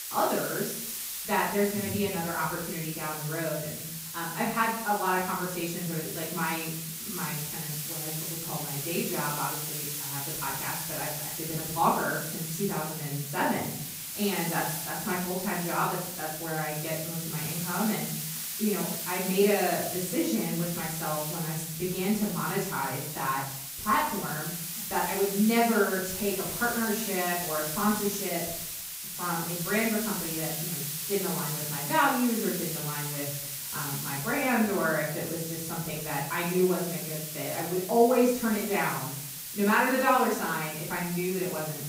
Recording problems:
off-mic speech; far
room echo; noticeable; dies away in 0.6 s
hiss; loud; throughout; 4 dB below the speech

